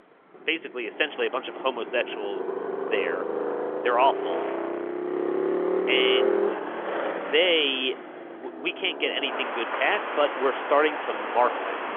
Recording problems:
phone-call audio; nothing above 3.5 kHz
traffic noise; loud; throughout; 3 dB below the speech

